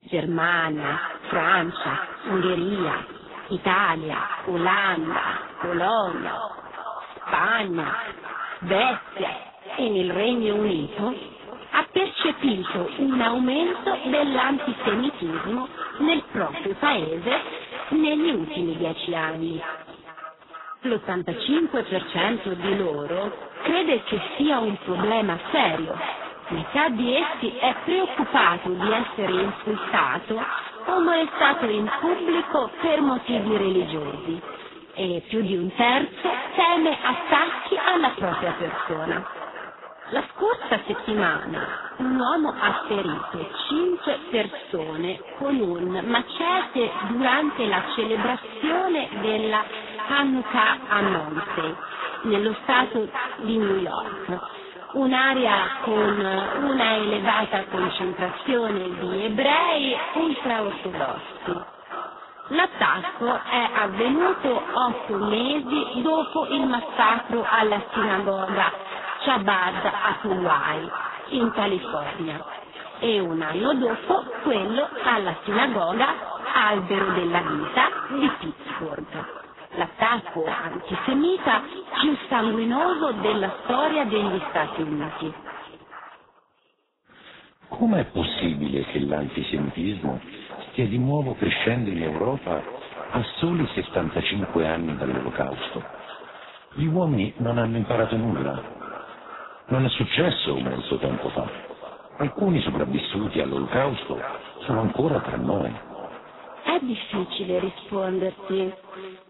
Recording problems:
echo of what is said; strong; throughout; 450 ms later, 10 dB below the speech
garbled, watery; badly; nothing above 4 kHz

